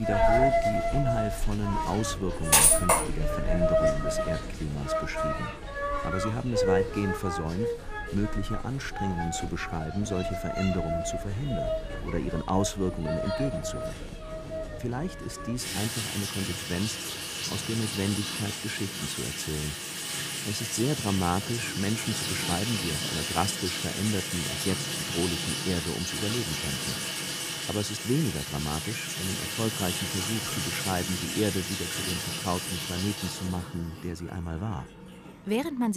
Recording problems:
household noises; very loud; throughout; 3 dB above the speech
abrupt cut into speech; at the start and the end

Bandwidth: 15 kHz